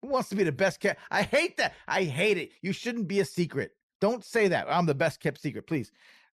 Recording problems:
none

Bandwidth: 13.5 kHz